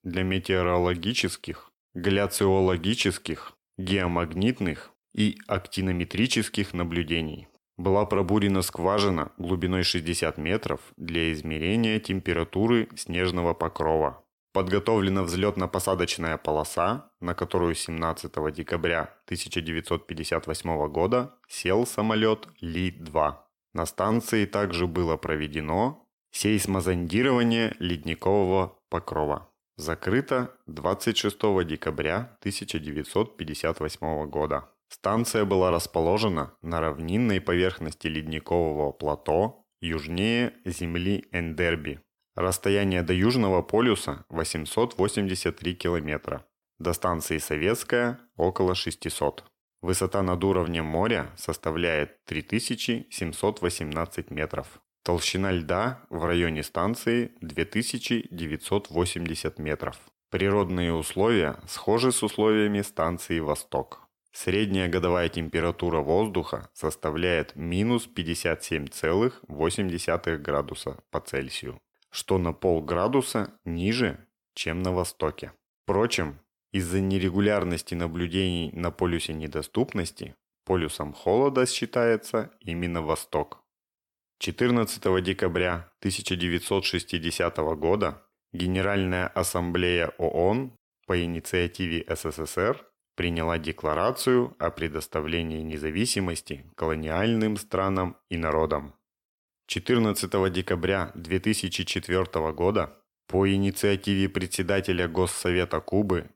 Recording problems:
none

